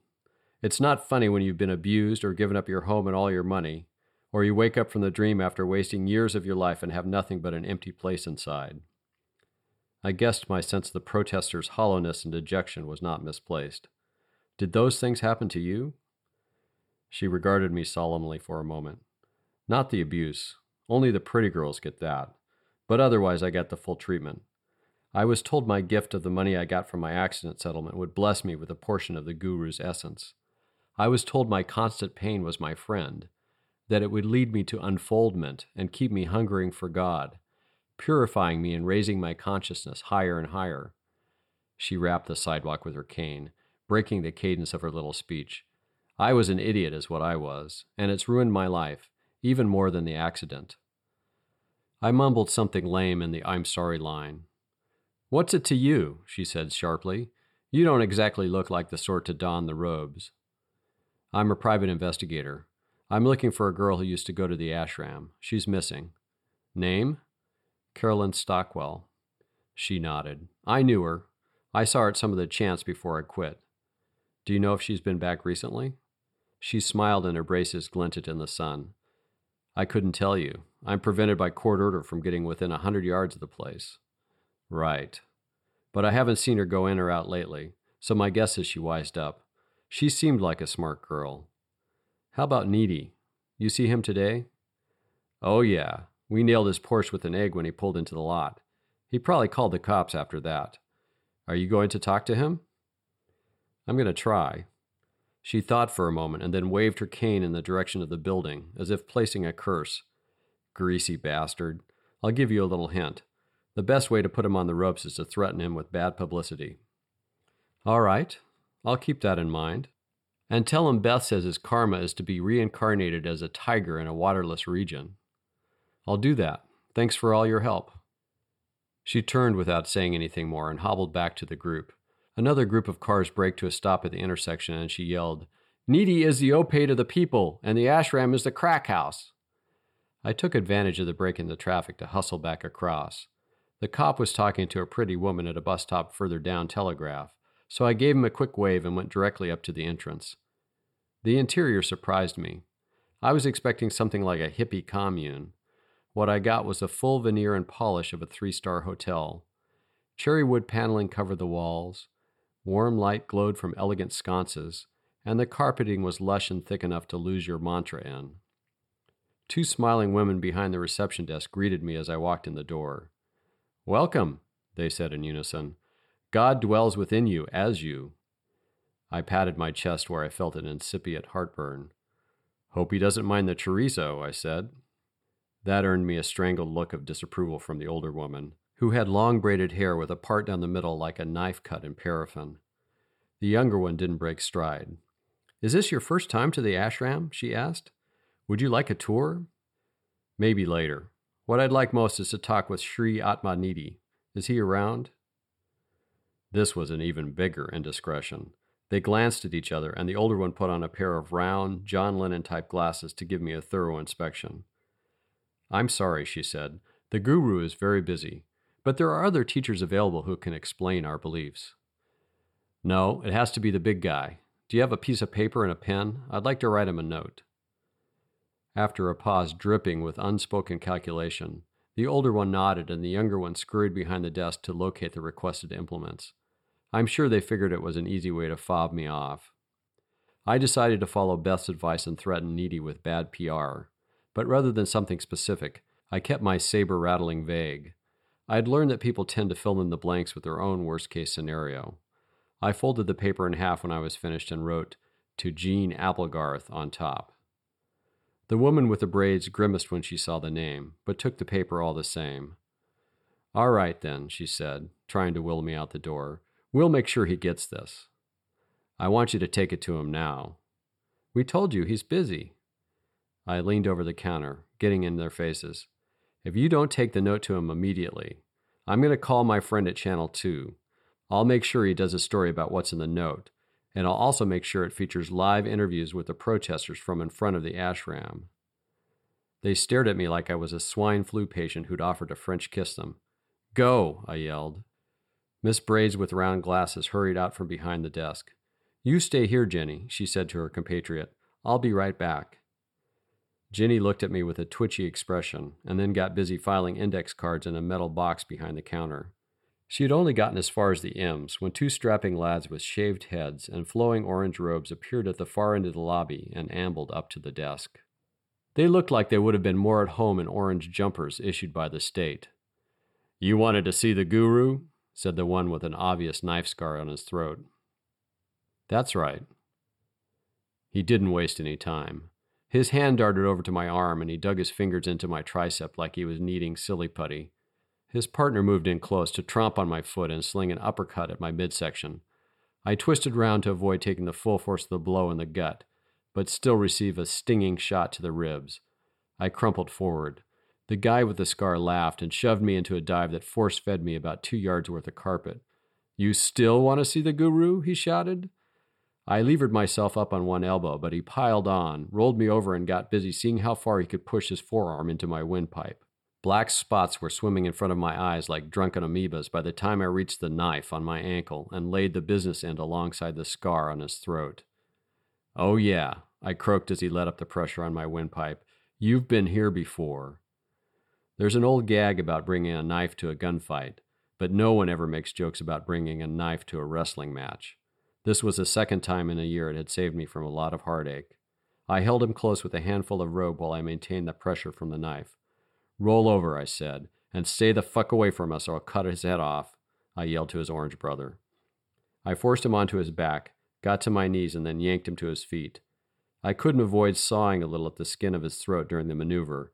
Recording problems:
none

